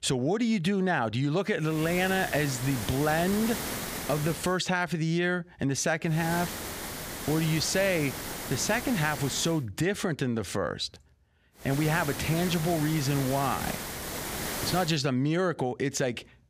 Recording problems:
hiss; loud; from 2 to 4.5 s, from 6 to 9.5 s and from 12 to 15 s; 7 dB below the speech

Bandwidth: 15 kHz